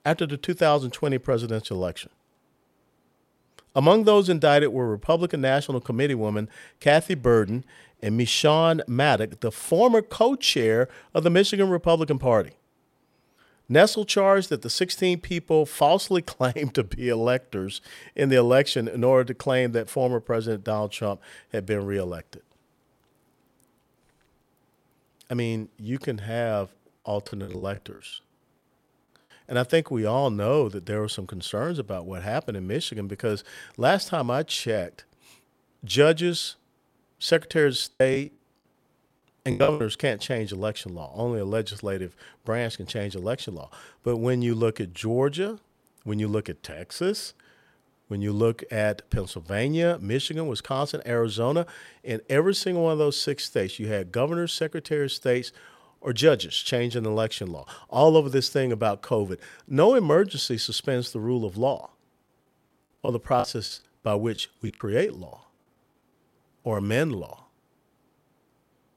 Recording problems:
choppy; very; at 27 s, from 38 to 40 s and from 1:03 to 1:05; 17% of the speech affected

